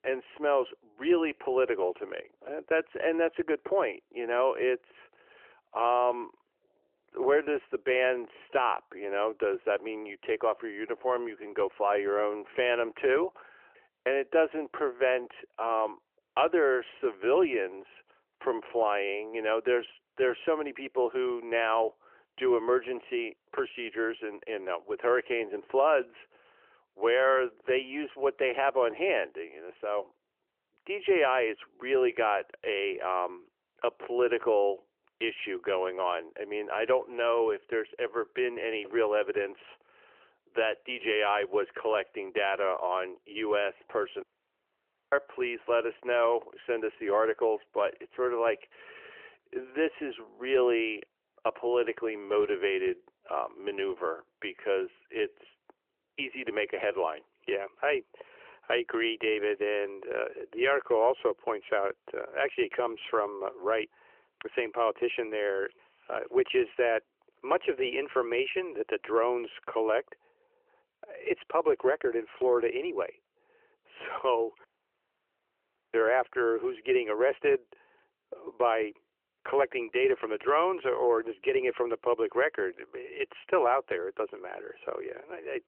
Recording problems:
phone-call audio; nothing above 3 kHz
audio cutting out; at 44 s for 1 s and at 1:15 for 1.5 s

